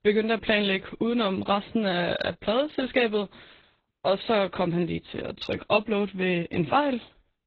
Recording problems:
garbled, watery; badly; nothing above 7 kHz

